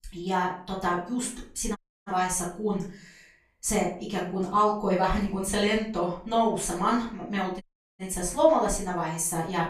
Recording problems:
off-mic speech; far
room echo; slight; dies away in 0.4 s
audio cutting out; at 2 s and at 7.5 s

